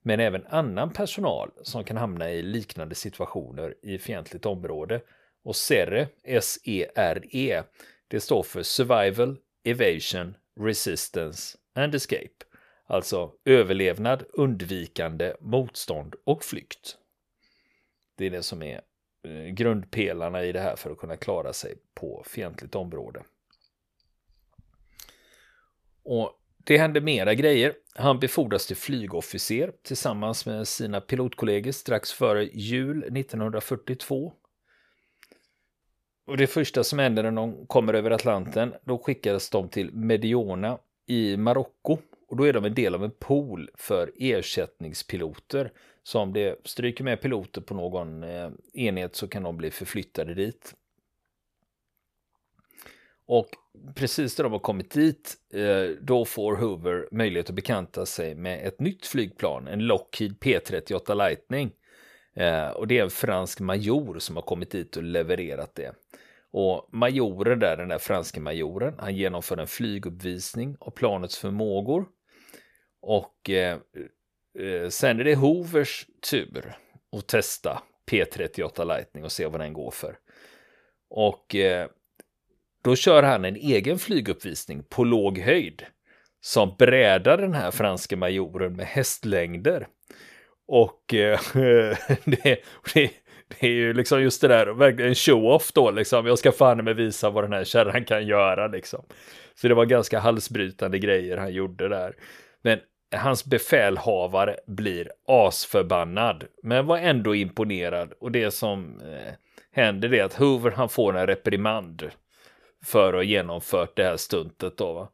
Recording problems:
none

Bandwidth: 14.5 kHz